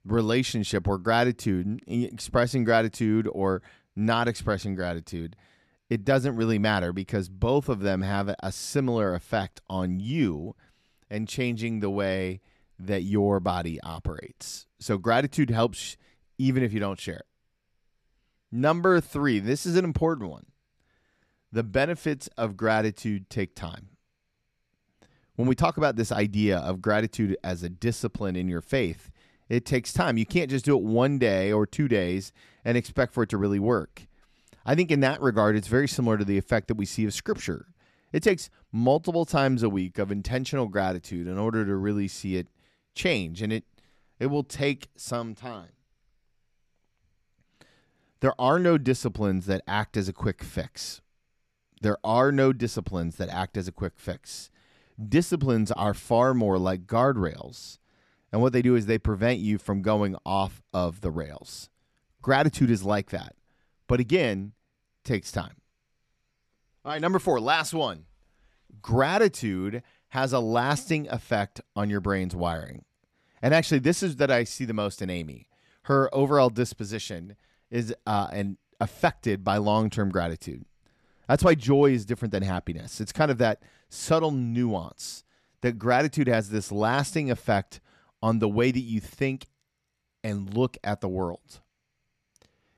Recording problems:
none

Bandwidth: 13.5 kHz